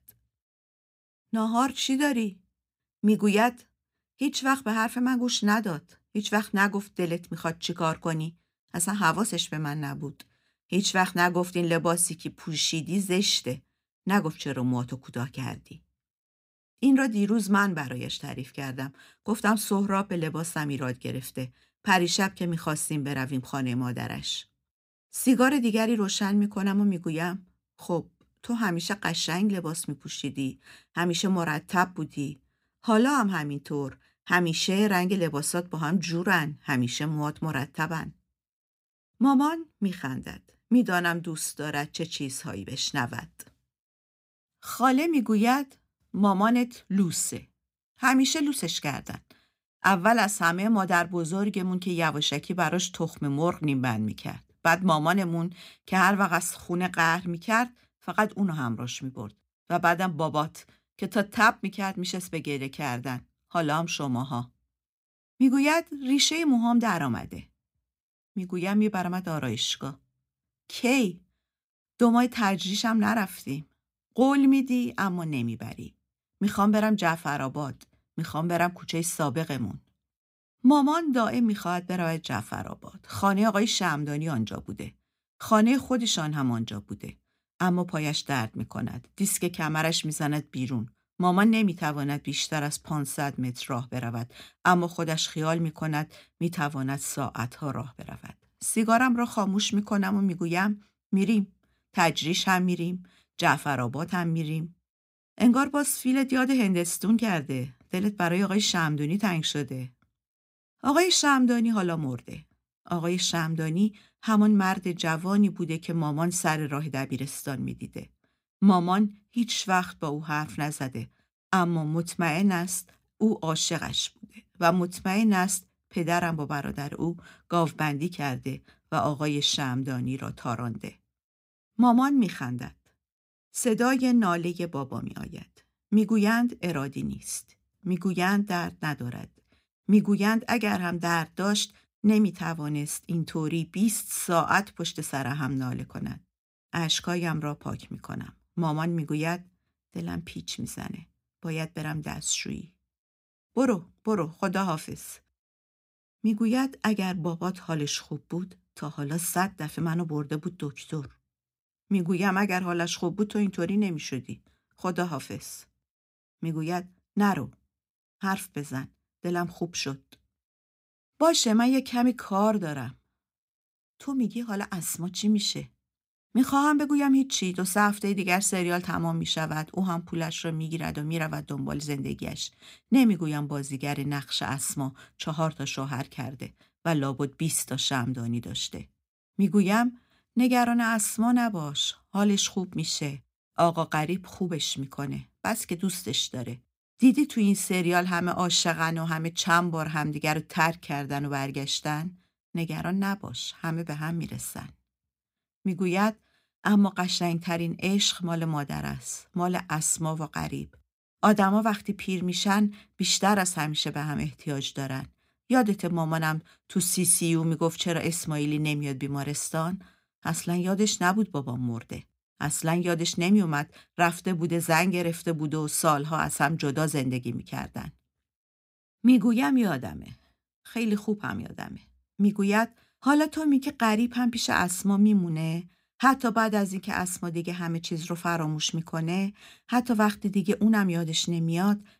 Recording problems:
none

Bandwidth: 15.5 kHz